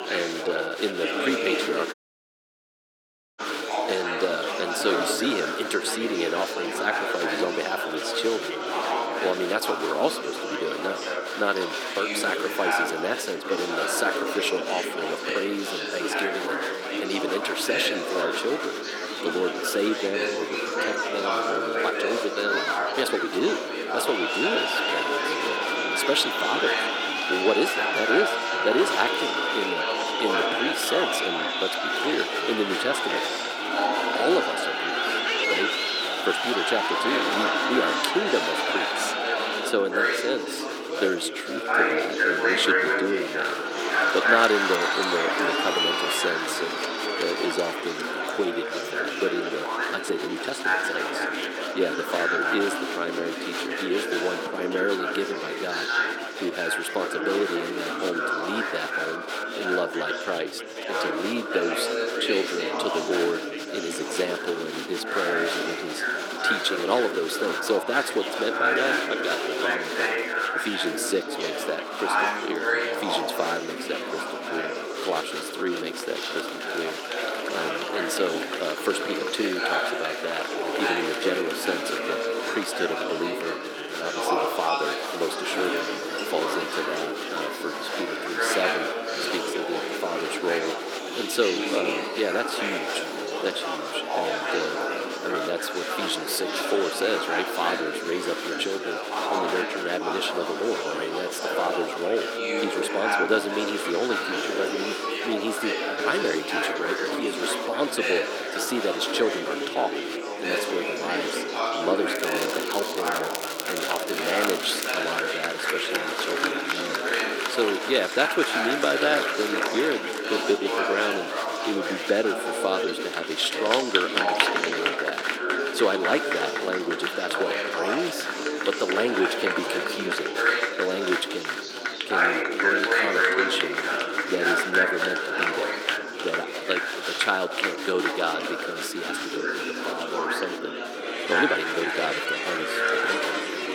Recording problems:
thin; somewhat; fading below 350 Hz
chatter from many people; very loud; throughout; 2 dB above the speech
crackling; loud; from 1:52 to 1:55; 5 dB below the speech
audio cutting out; at 2 s for 1.5 s
uneven, jittery; strongly; from 23 s to 2:22

